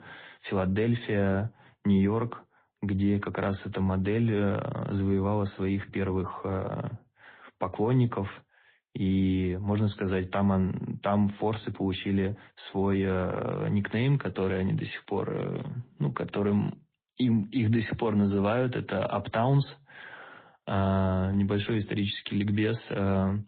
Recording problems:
high frequencies cut off; severe; nothing above 4 kHz
garbled, watery; slightly

